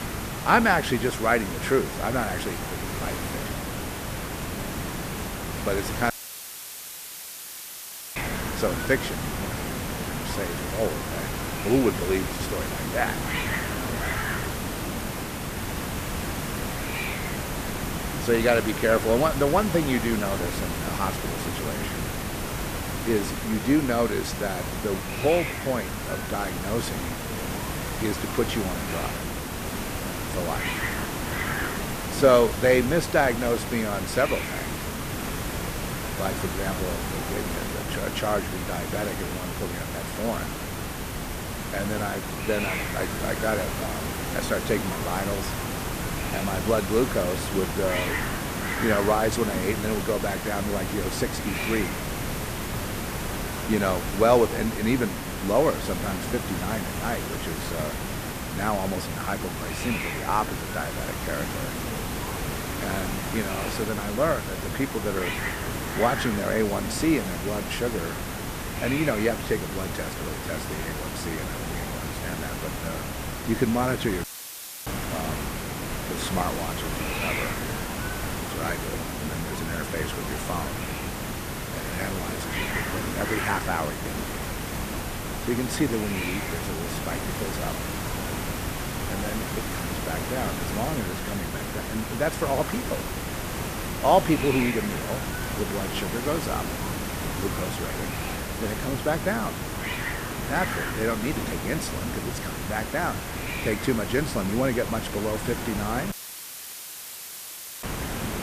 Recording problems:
hiss; loud; throughout; 2 dB below the speech
audio cutting out; filled with static; at 6 s for 2 s, at 1:14 for 0.5 s and at 1:46 for 1.5 s

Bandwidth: 14.5 kHz